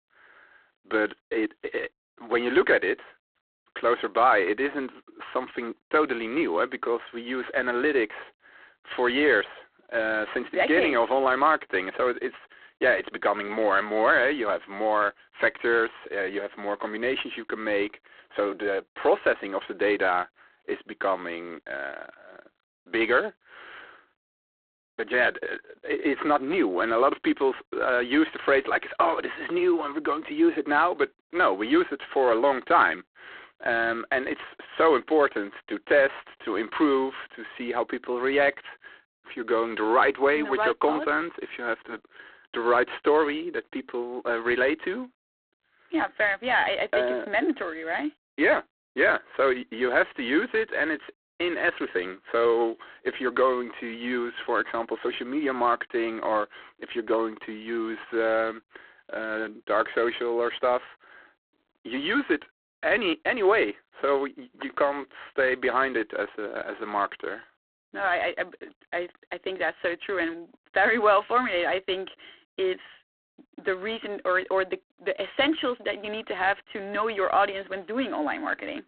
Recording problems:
phone-call audio; poor line; nothing above 3.5 kHz

